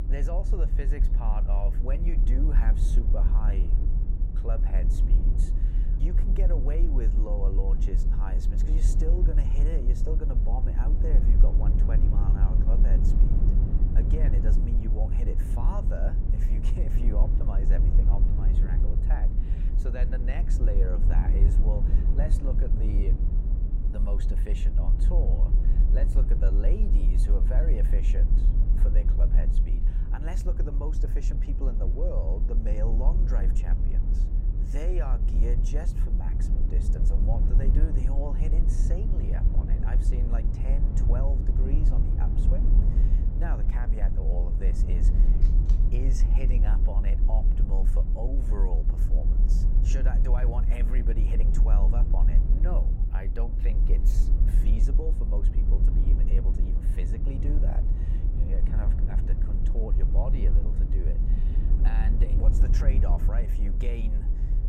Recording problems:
low rumble; loud; throughout; 3 dB below the speech
phone ringing; faint; at 45 s; peak 15 dB below the speech

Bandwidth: 16 kHz